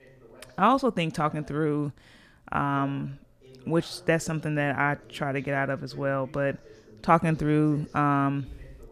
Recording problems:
voice in the background; faint; throughout; 25 dB below the speech

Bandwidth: 14.5 kHz